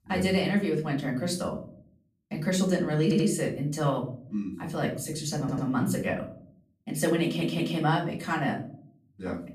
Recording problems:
off-mic speech; far
room echo; slight; dies away in 0.5 s
audio stuttering; at 3 s, at 5.5 s and at 7 s

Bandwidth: 14.5 kHz